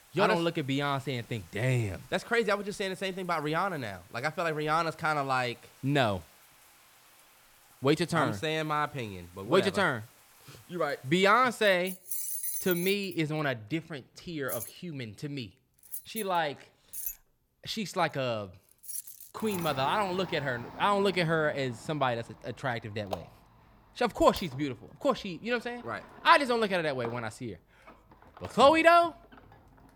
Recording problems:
household noises; noticeable; throughout; 10 dB below the speech

